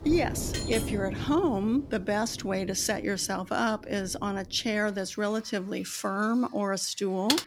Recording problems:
rain or running water; noticeable; throughout; 10 dB below the speech
clattering dishes; noticeable; at 0.5 s; peak 6 dB below the speech
keyboard typing; very faint; at 7.5 s; peak 1 dB above the speech

